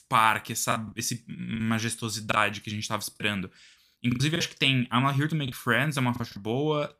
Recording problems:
choppy; very; from 0.5 to 2.5 s, from 3 to 4.5 s and at 5.5 s; 11% of the speech affected

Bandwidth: 15 kHz